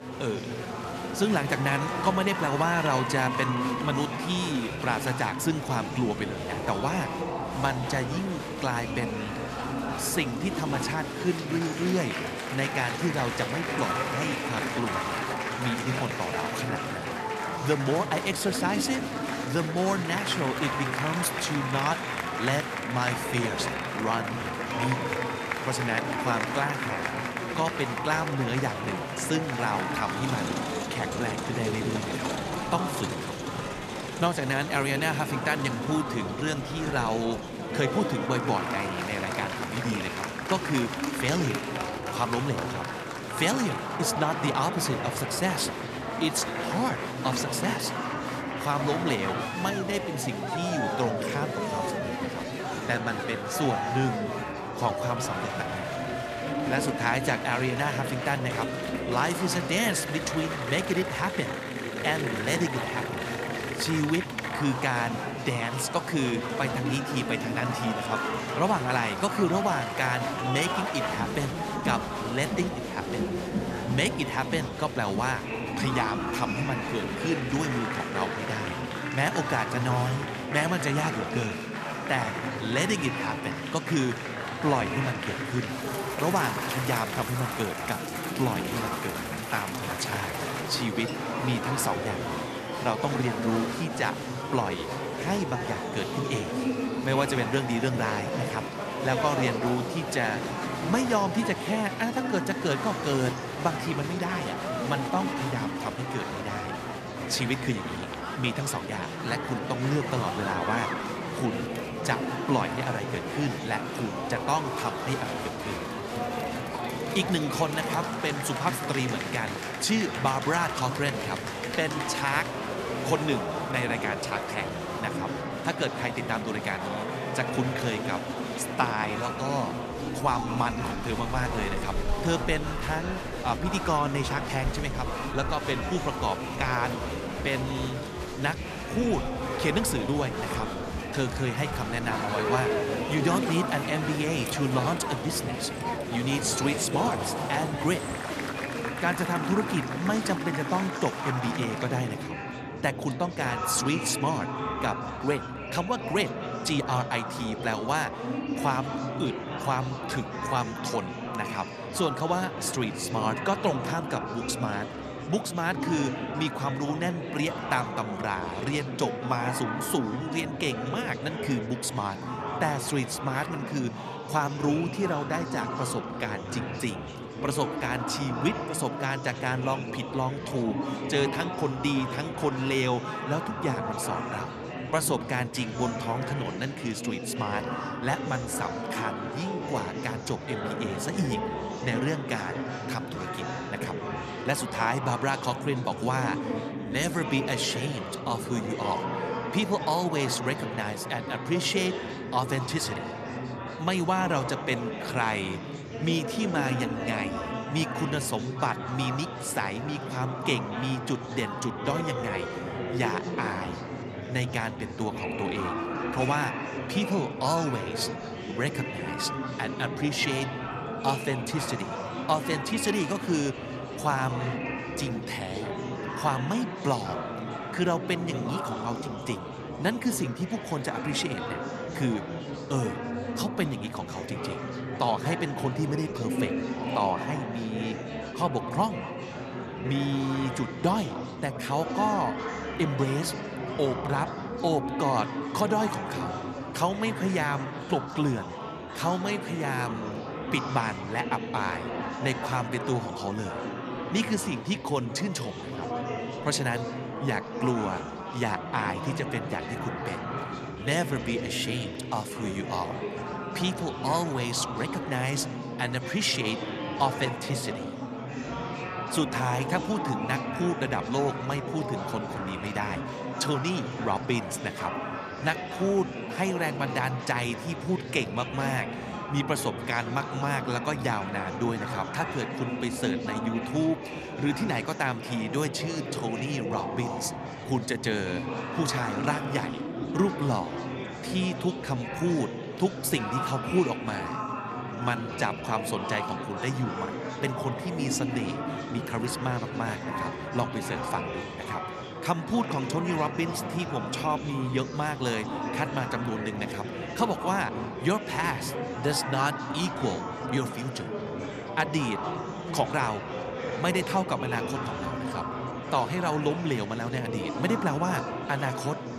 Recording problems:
echo of what is said; faint; throughout; 240 ms later, 20 dB below the speech
murmuring crowd; loud; throughout; 3 dB below the speech

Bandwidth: 14 kHz